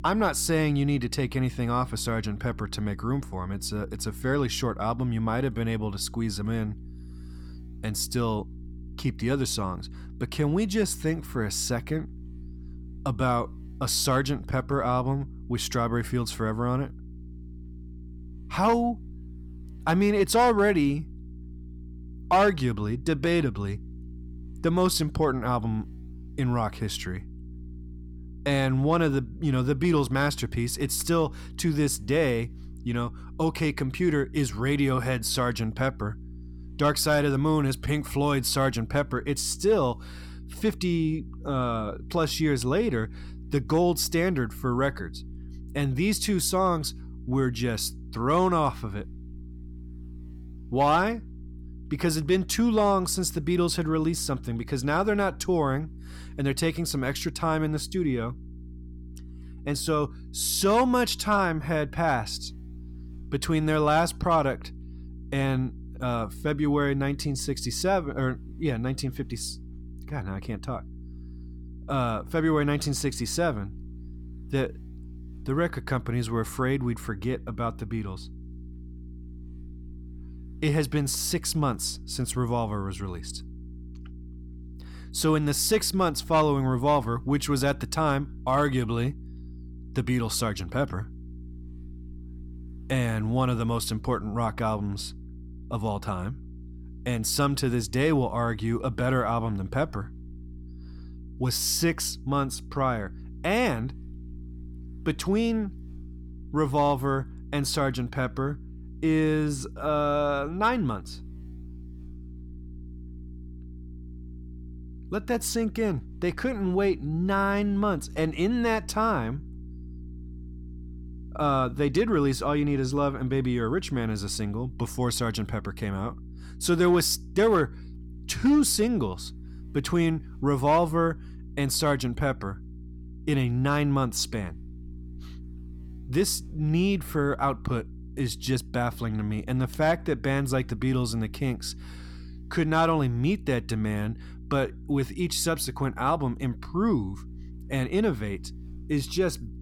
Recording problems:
electrical hum; faint; throughout; 60 Hz, 25 dB below the speech

